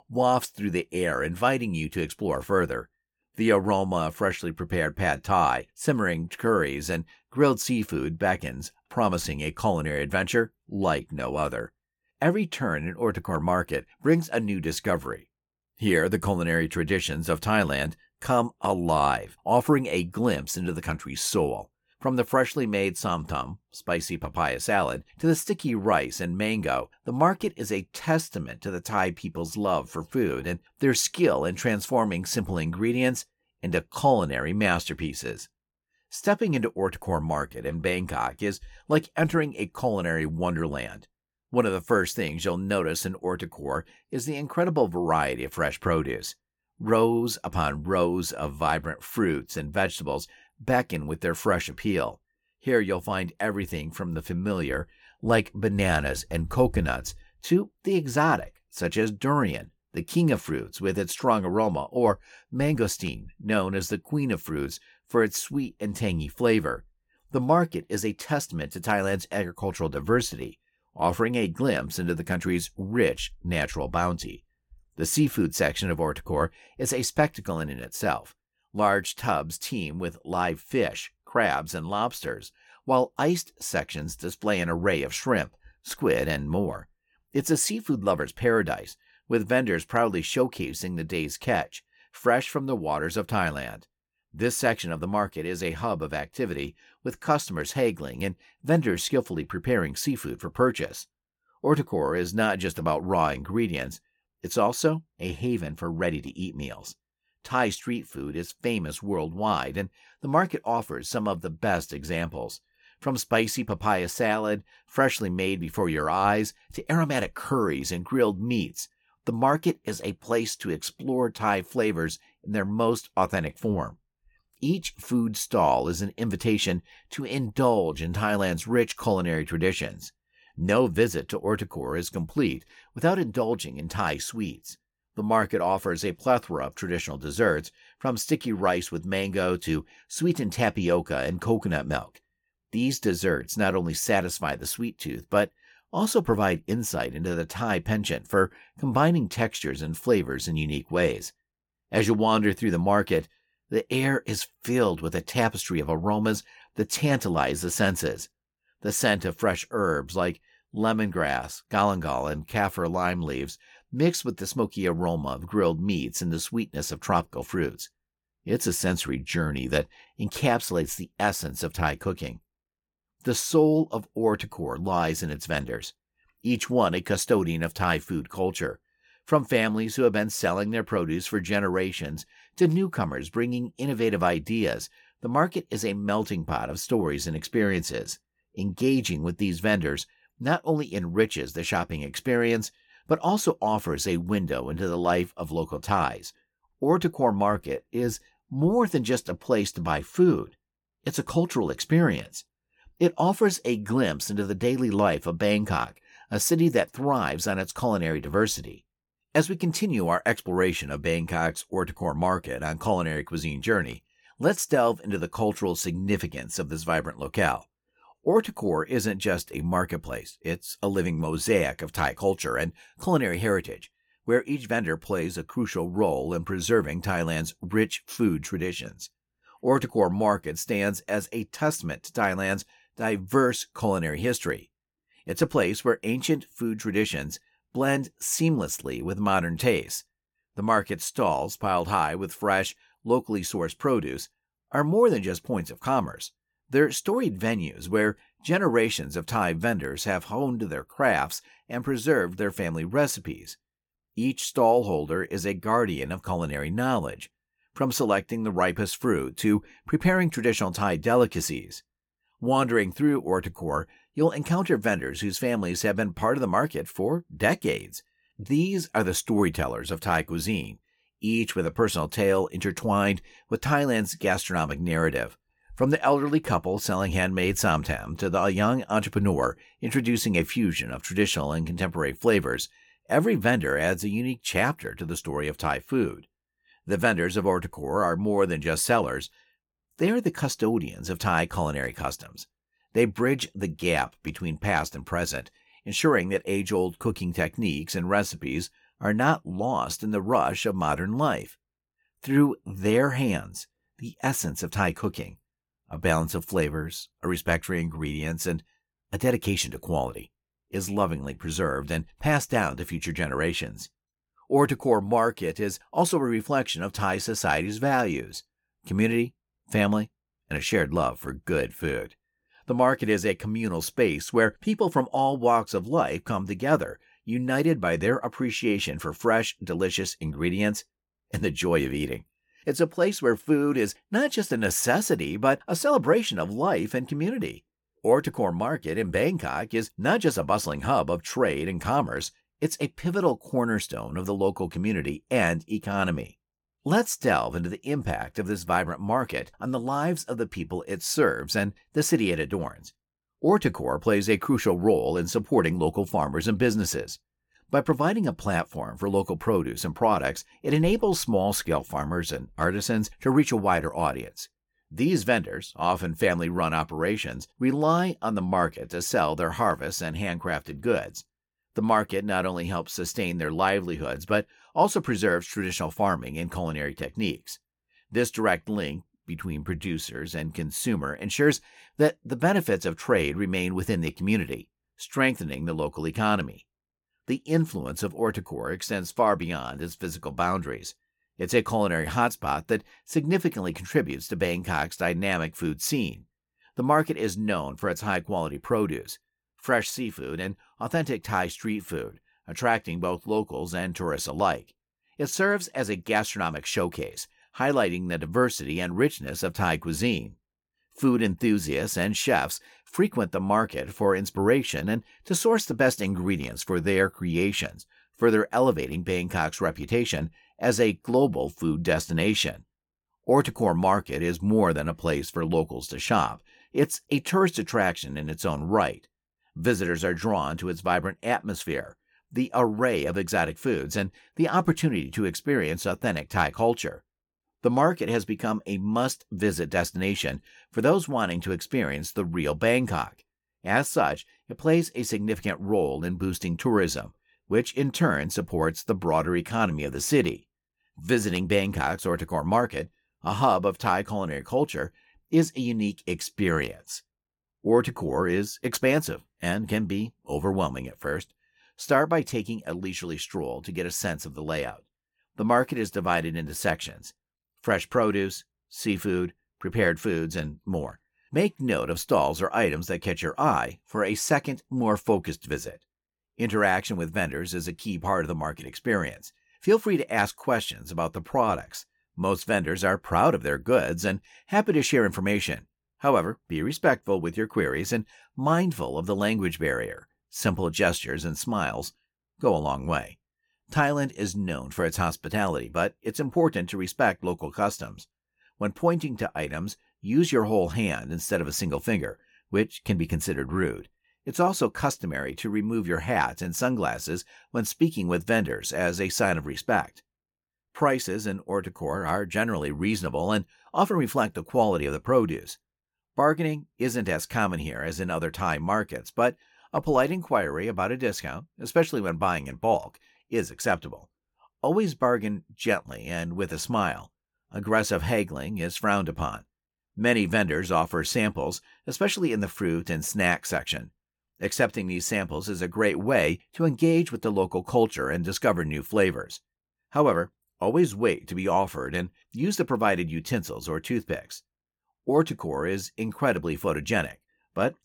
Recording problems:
none

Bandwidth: 17.5 kHz